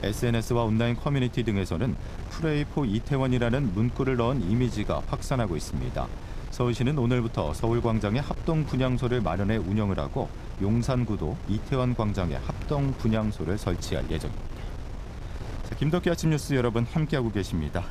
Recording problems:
wind noise on the microphone; occasional gusts; 15 dB below the speech

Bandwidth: 14.5 kHz